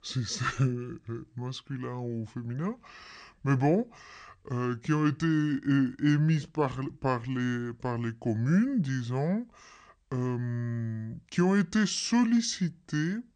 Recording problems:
wrong speed and pitch; too slow and too low; 0.7 times normal speed

